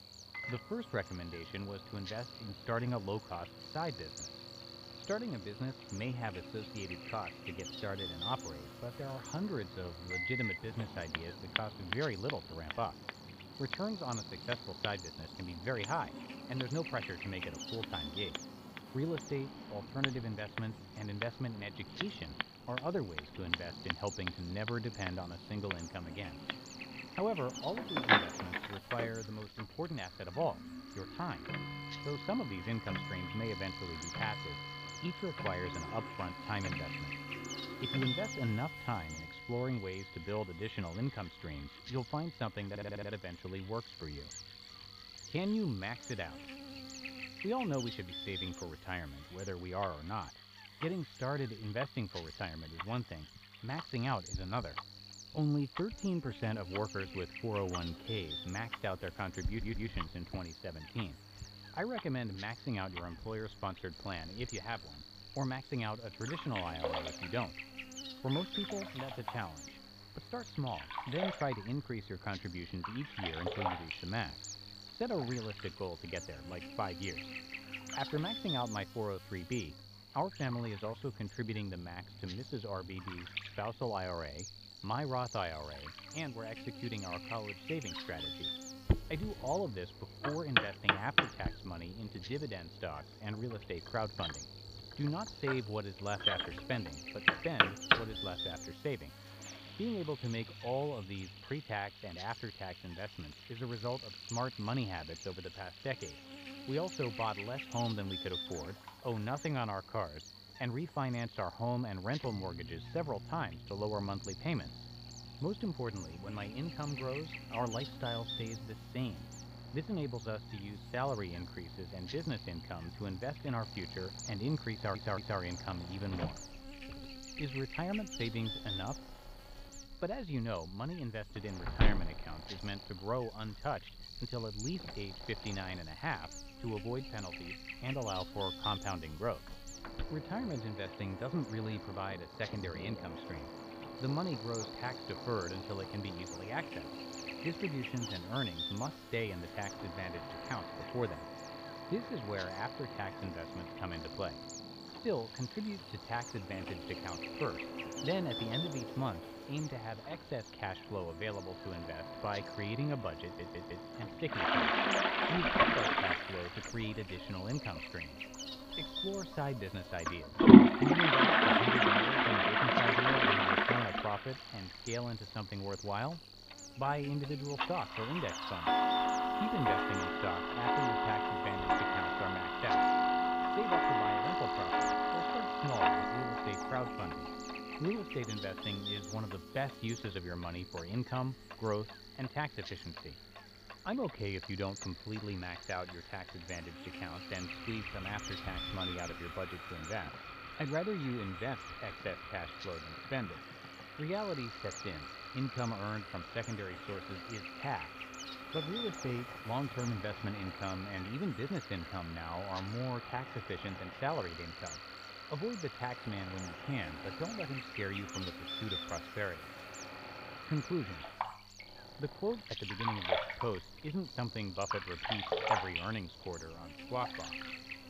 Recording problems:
muffled; very; fading above 3.5 kHz
household noises; very loud; throughout; 5 dB above the speech
electrical hum; loud; throughout; 50 Hz, 6 dB below the speech
machinery noise; noticeable; throughout; 20 dB below the speech
audio stuttering; 4 times, first at 43 s

